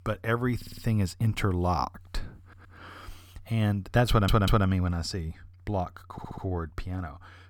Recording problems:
audio stuttering; 4 times, first at 0.5 s

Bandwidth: 18.5 kHz